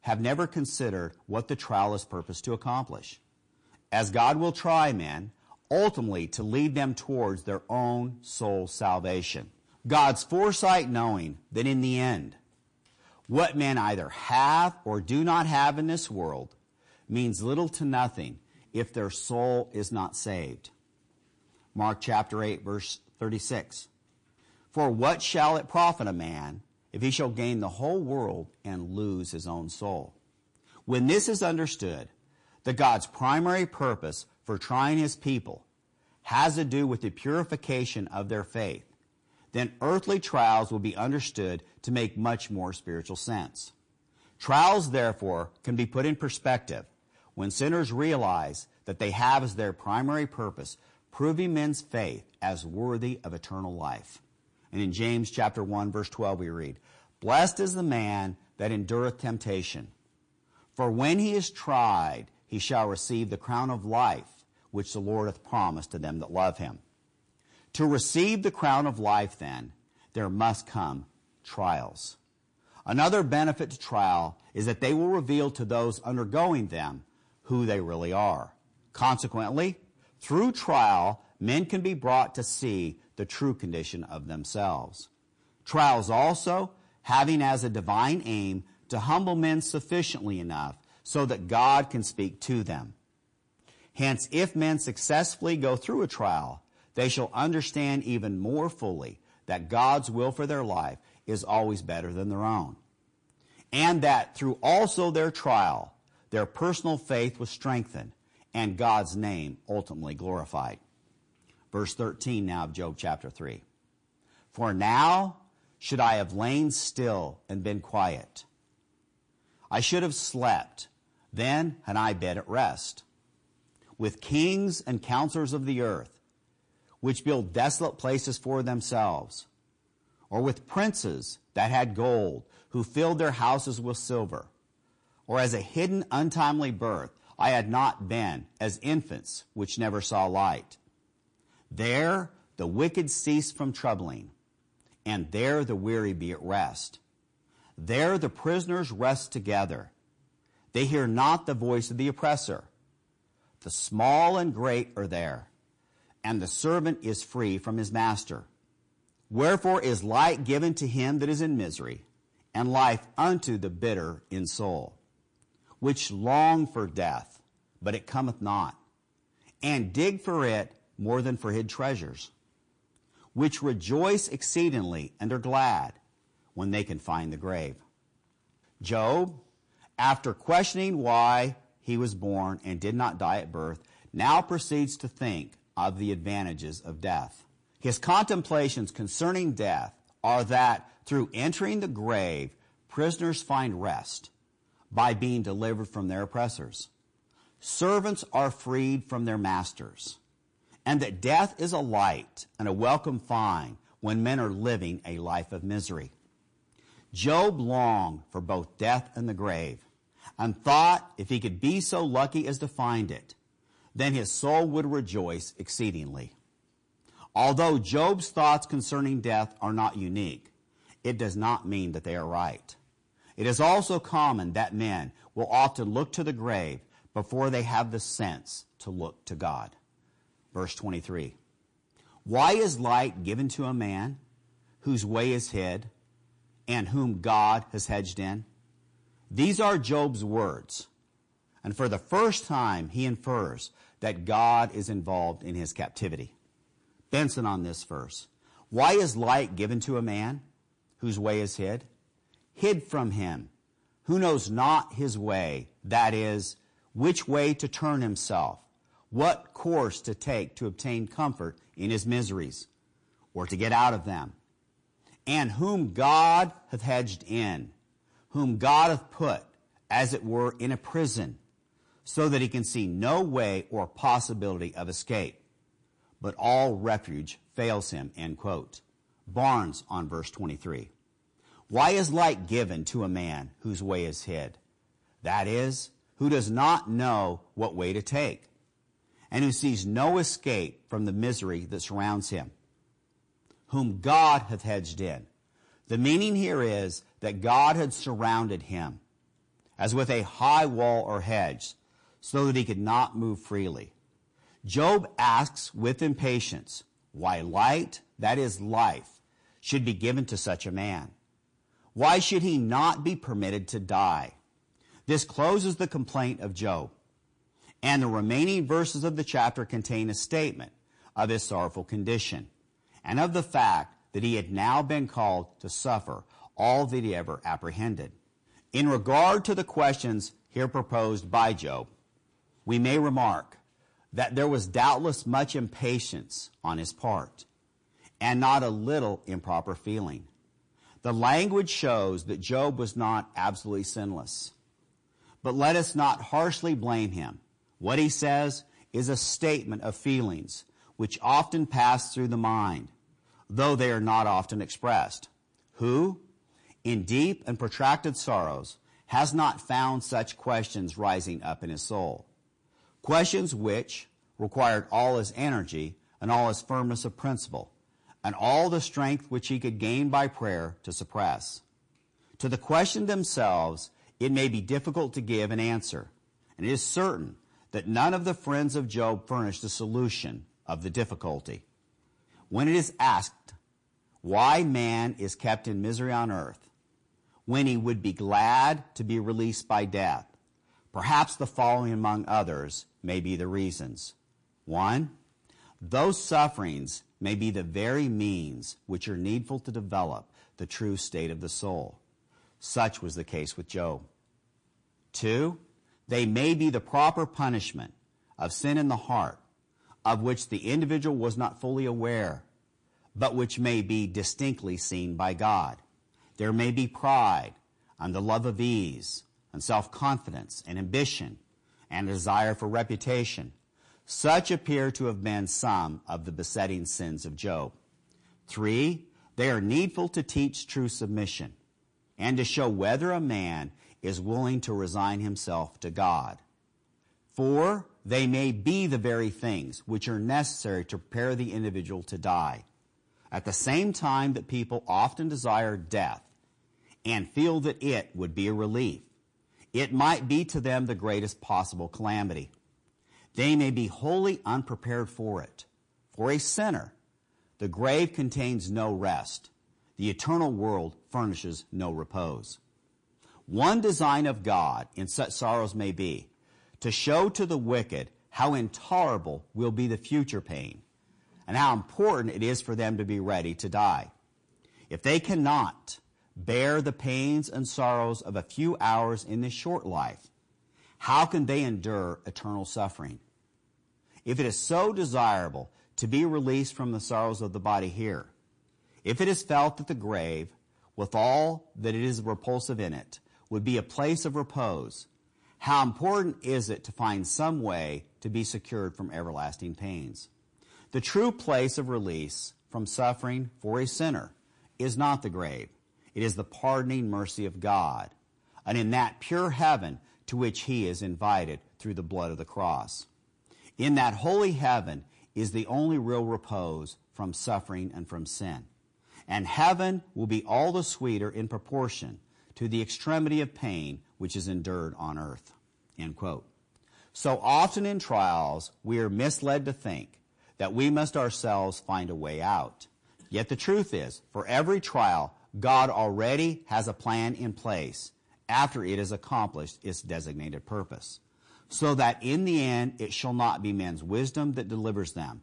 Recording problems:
distortion; slight; 10 dB below the speech
garbled, watery; slightly; nothing above 8.5 kHz

